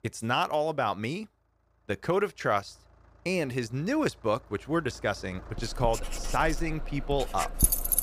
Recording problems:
household noises; very loud; from 6 s on; as loud as the speech
traffic noise; noticeable; throughout; 15 dB below the speech

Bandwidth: 15 kHz